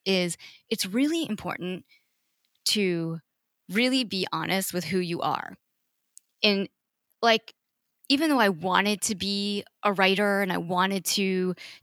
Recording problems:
none

